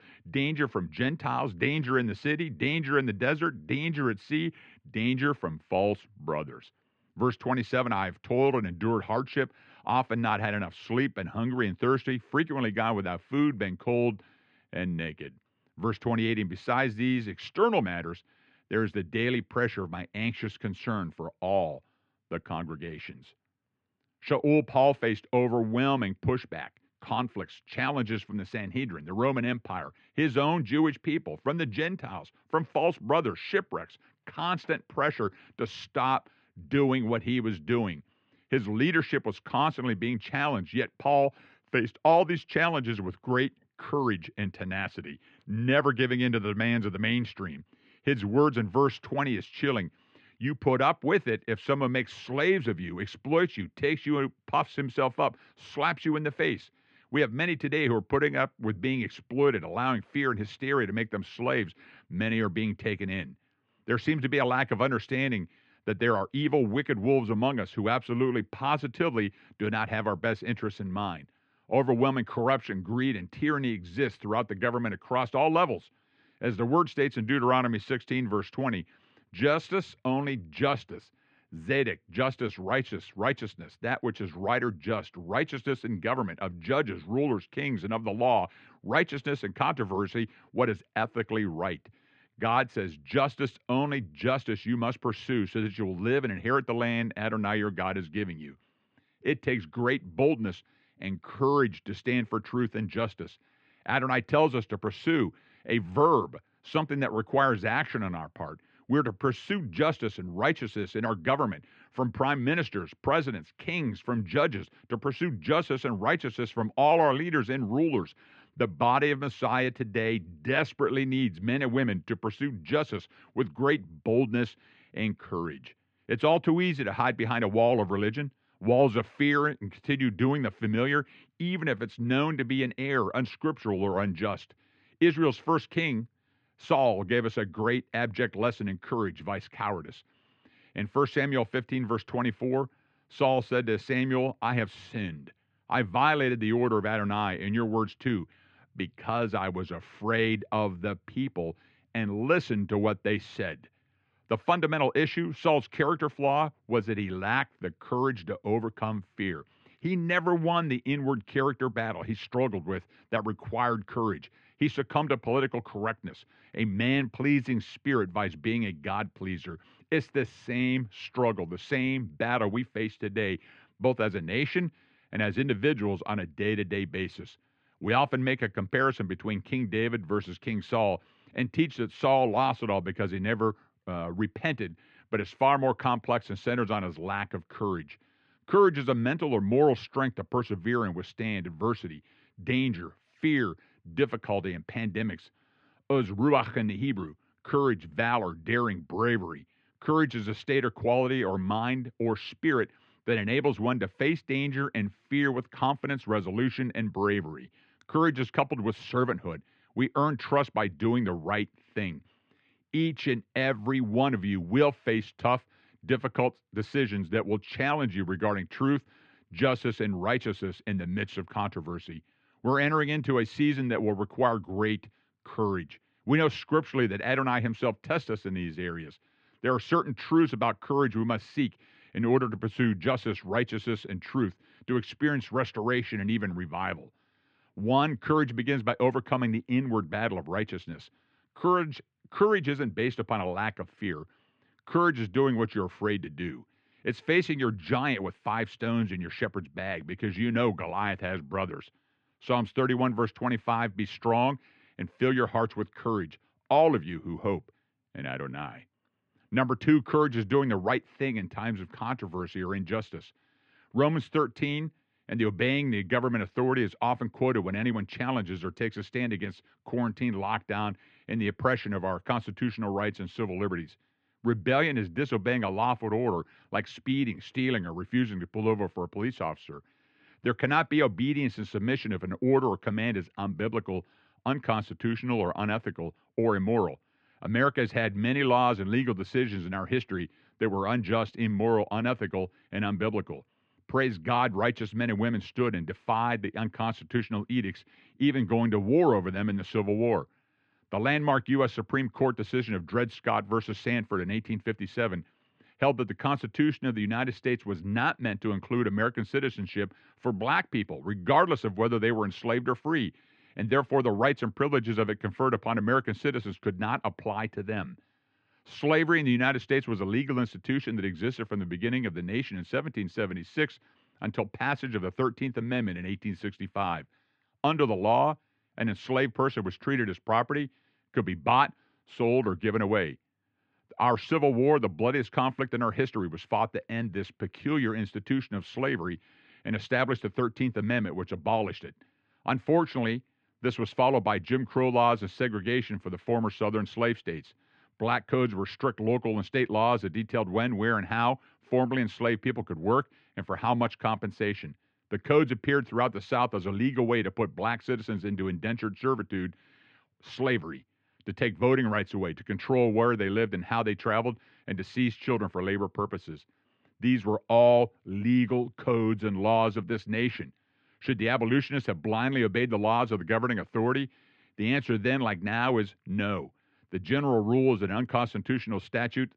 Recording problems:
muffled; very; fading above 2.5 kHz

